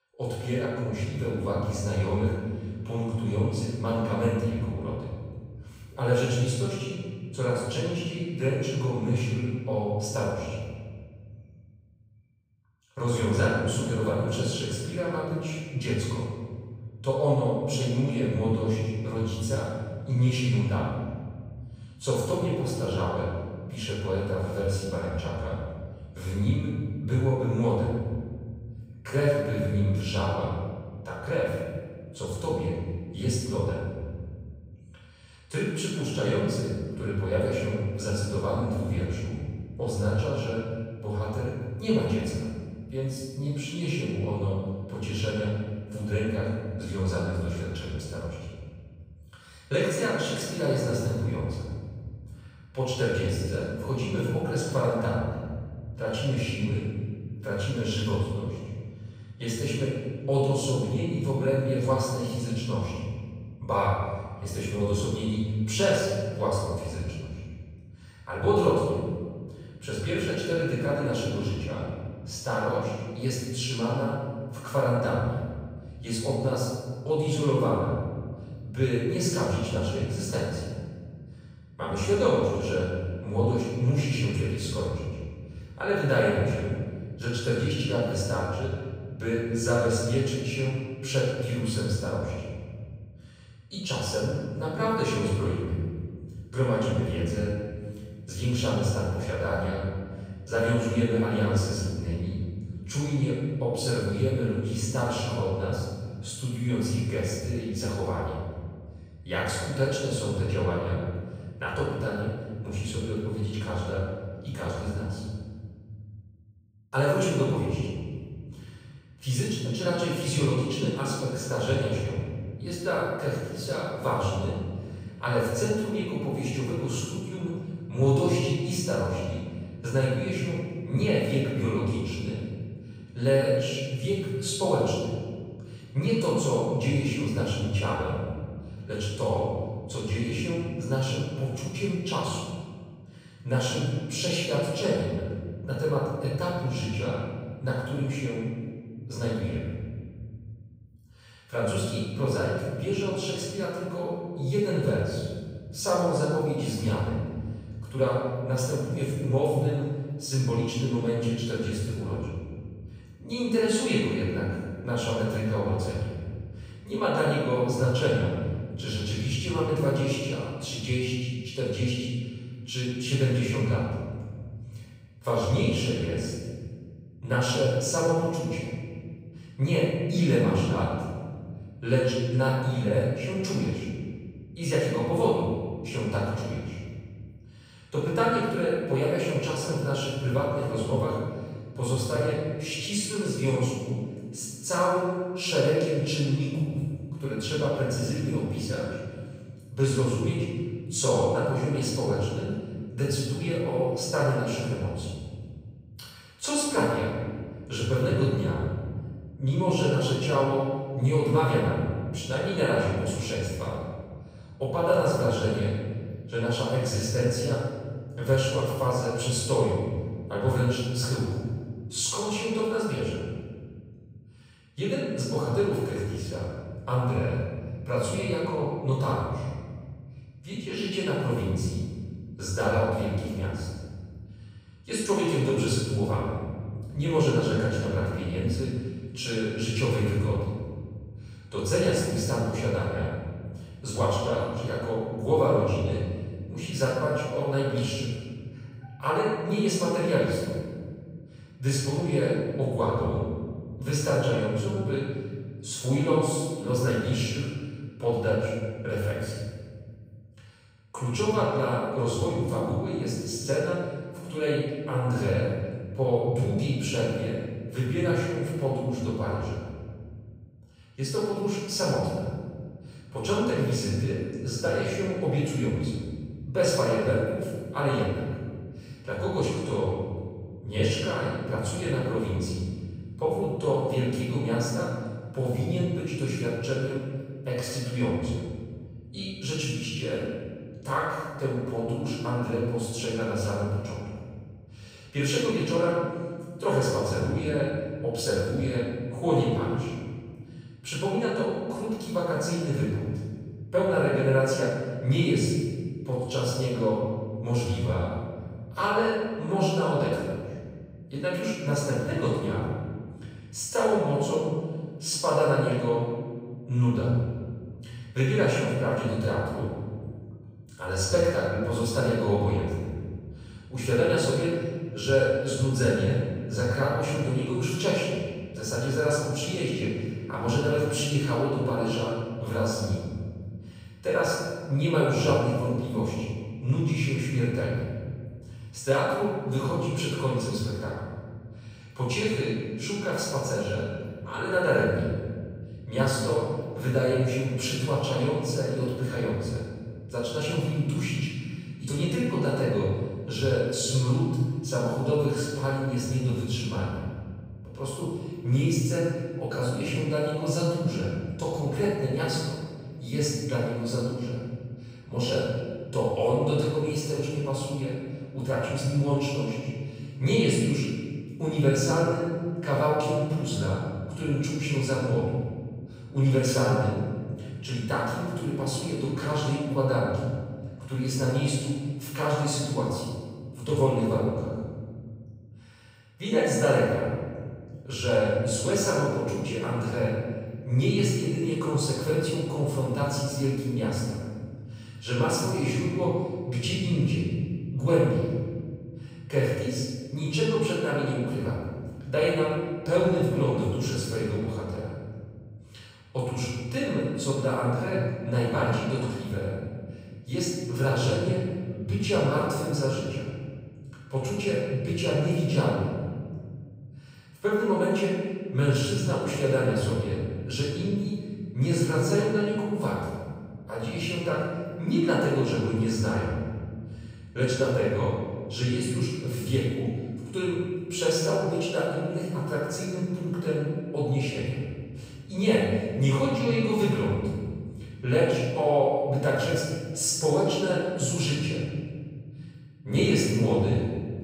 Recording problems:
room echo; strong; dies away in 2 s
off-mic speech; far

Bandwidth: 15.5 kHz